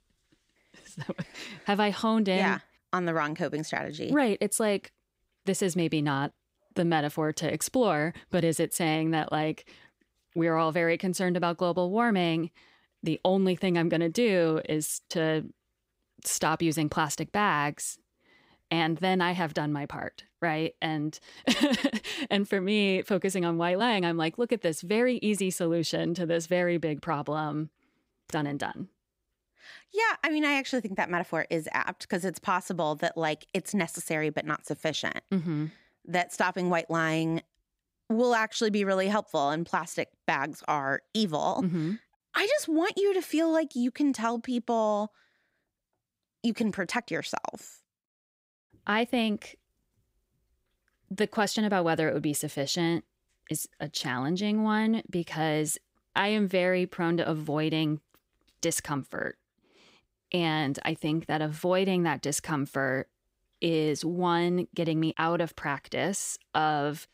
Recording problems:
uneven, jittery; slightly; from 1 to 54 s

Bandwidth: 15.5 kHz